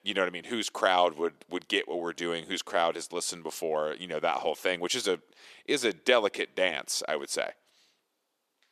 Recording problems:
thin; somewhat; fading below 450 Hz

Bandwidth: 14 kHz